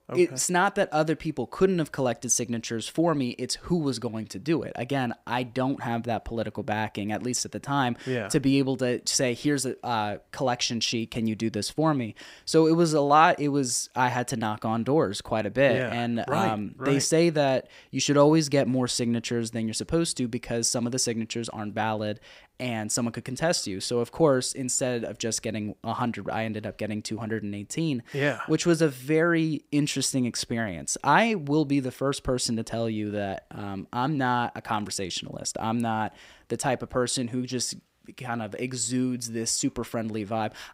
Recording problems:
none

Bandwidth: 15.5 kHz